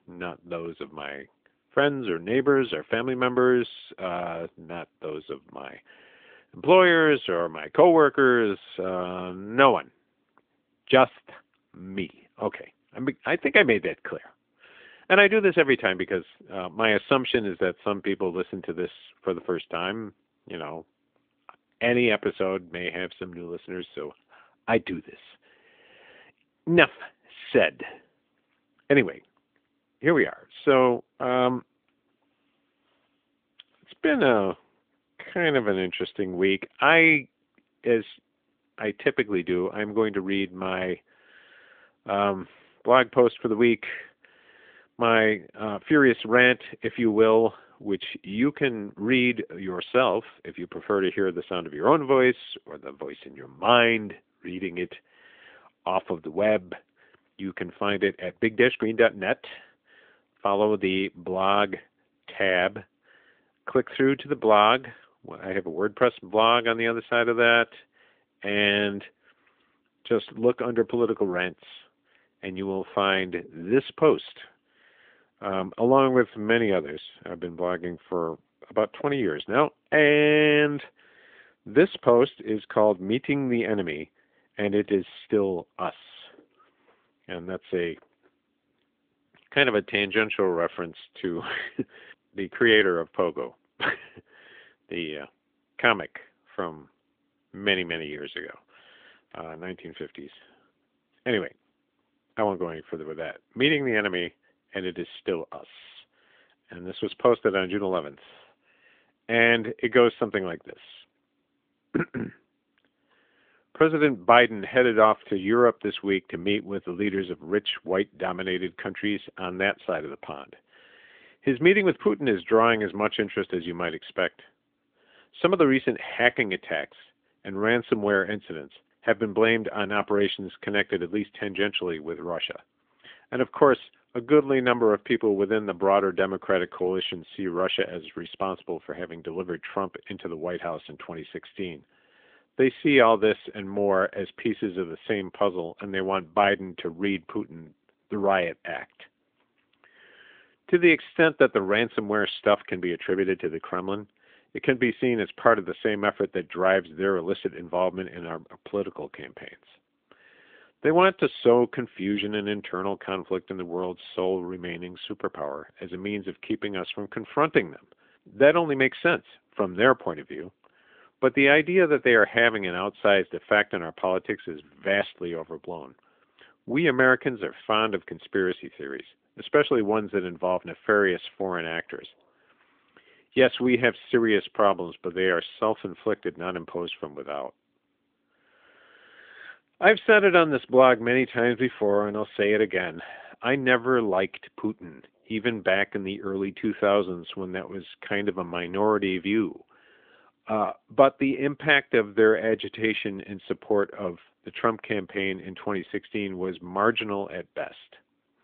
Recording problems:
phone-call audio; nothing above 3.5 kHz

